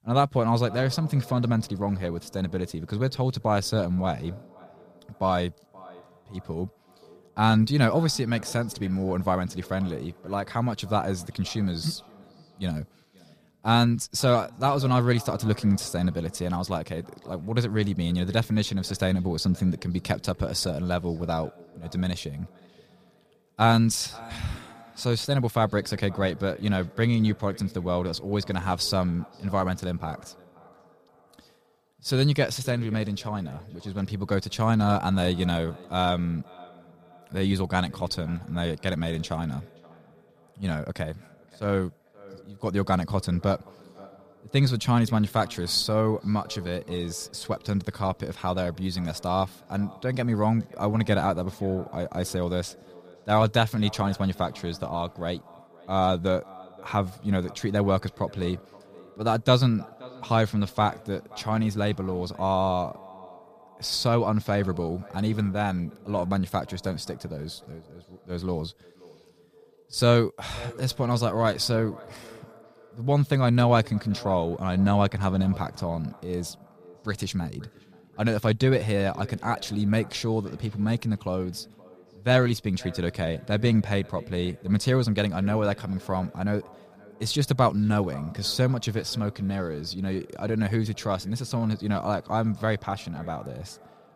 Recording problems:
echo of what is said; faint; throughout; 530 ms later, 20 dB below the speech

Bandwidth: 15 kHz